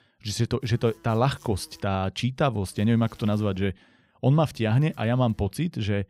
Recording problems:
electrical hum; faint; from 0.5 to 2 s, at 2.5 s and from 4.5 to 5.5 s; 50 Hz, 30 dB below the speech

